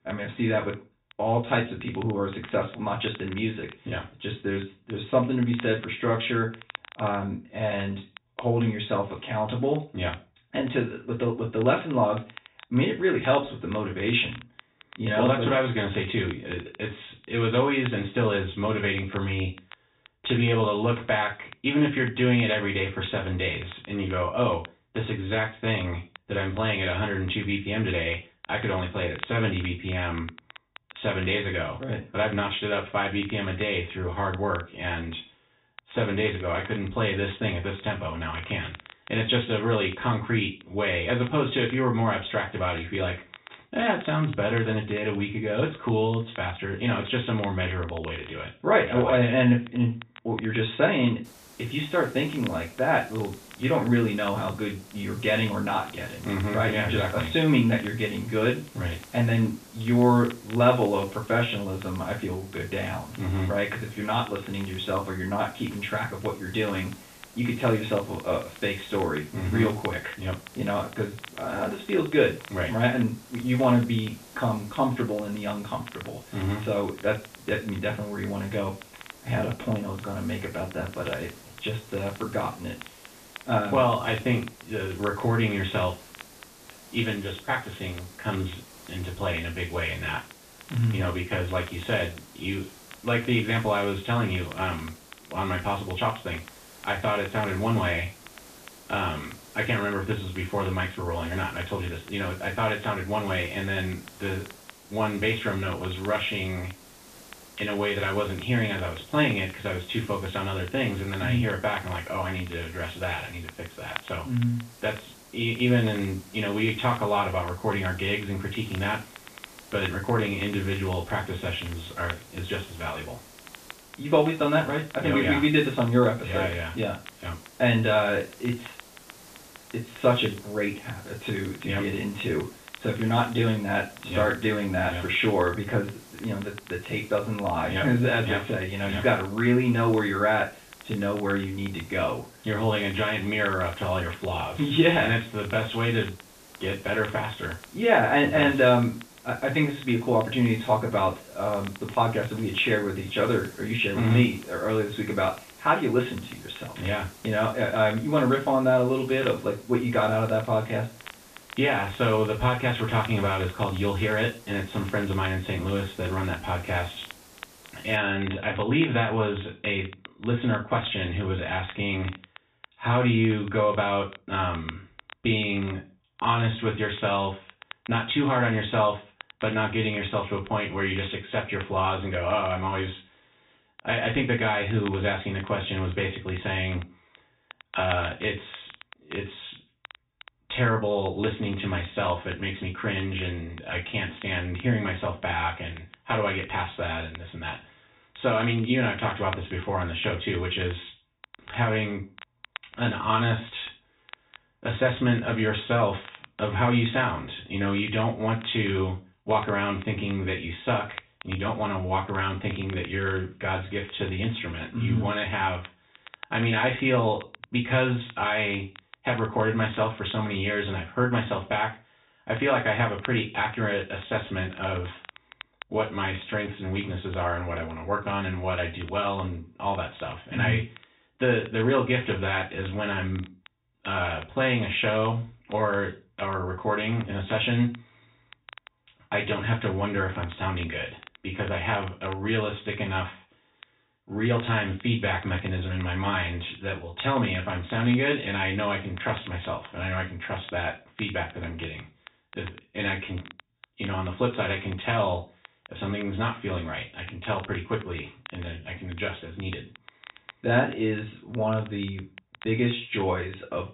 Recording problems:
off-mic speech; far
high frequencies cut off; severe; nothing above 4 kHz
room echo; slight; dies away in 0.3 s
hiss; faint; from 51 s to 2:48; 20 dB below the speech
crackle, like an old record; faint; 20 dB below the speech

